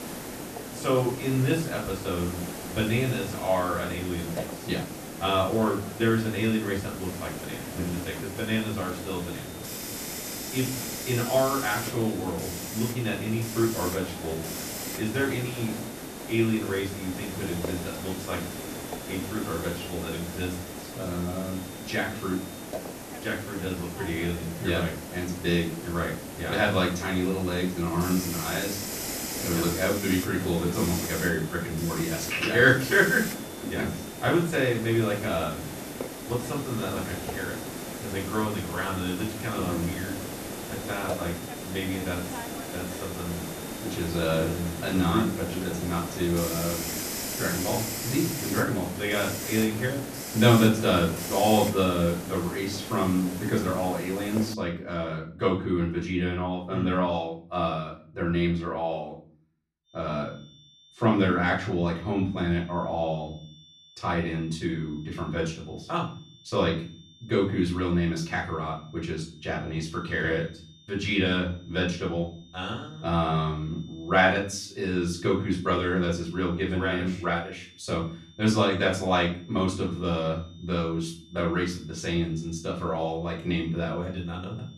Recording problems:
off-mic speech; far
room echo; slight; dies away in 0.4 s
hiss; loud; until 55 s; 7 dB below the speech
high-pitched whine; faint; from 9 to 23 s, from 30 to 47 s and from 1:00 on; 3.5 kHz, 25 dB below the speech

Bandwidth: 14 kHz